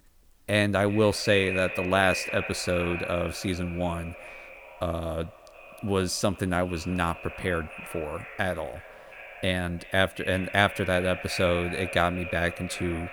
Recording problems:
echo of what is said; strong; throughout; 360 ms later, 9 dB below the speech

